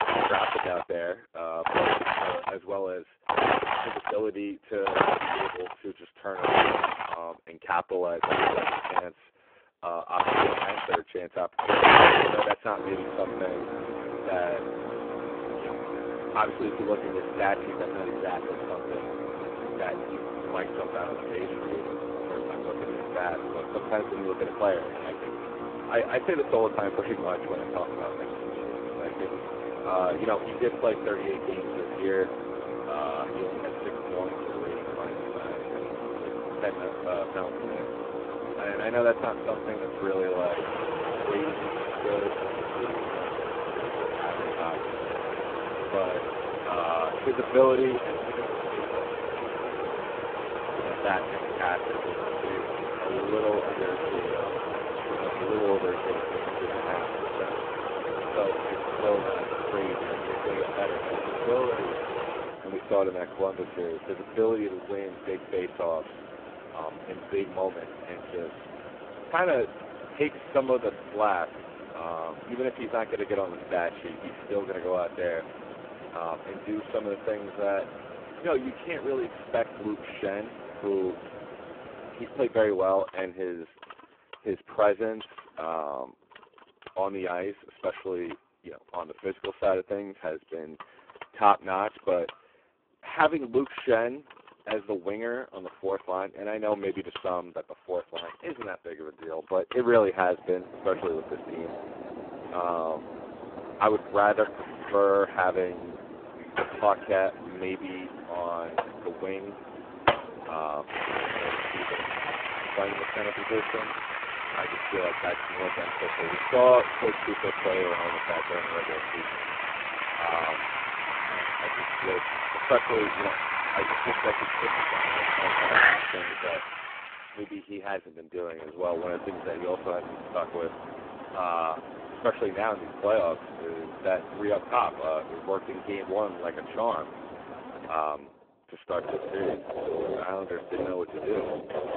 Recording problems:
phone-call audio; poor line
machinery noise; loud; throughout; as loud as the speech

